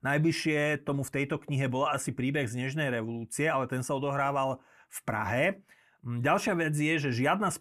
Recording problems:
none

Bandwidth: 14.5 kHz